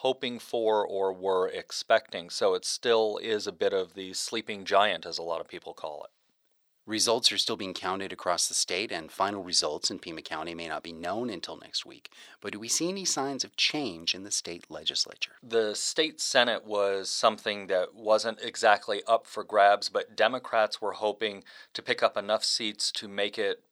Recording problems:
thin; very; fading below 500 Hz

